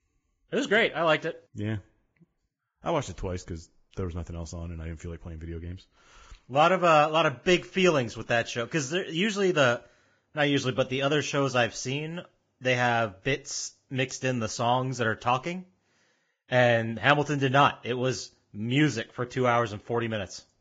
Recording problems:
garbled, watery; badly; nothing above 7.5 kHz

